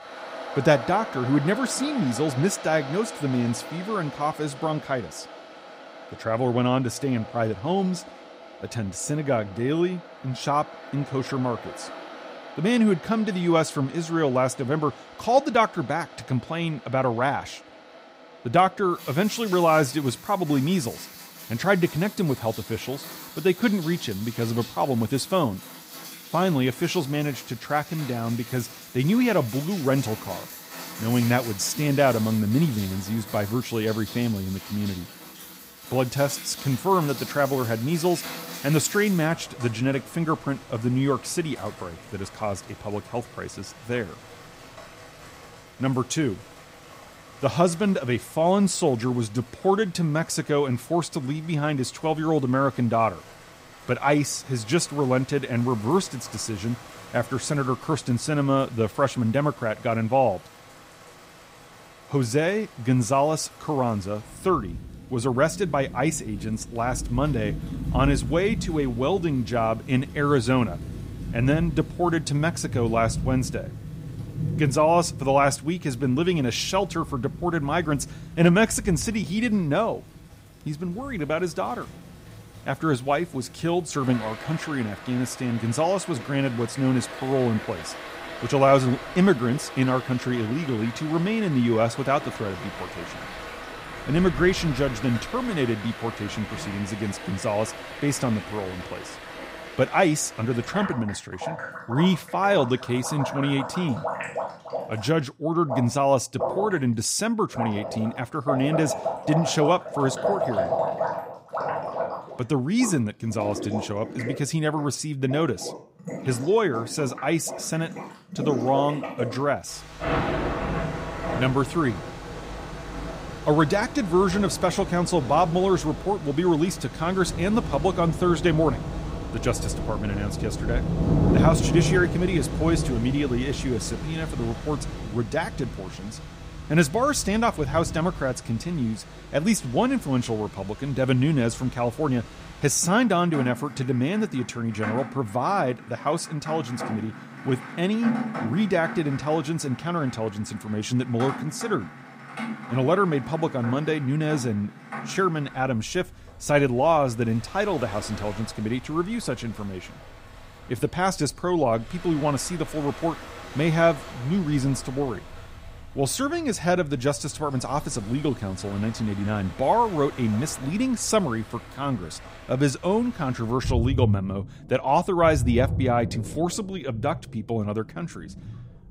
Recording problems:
rain or running water; loud; throughout; 10 dB below the speech

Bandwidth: 15.5 kHz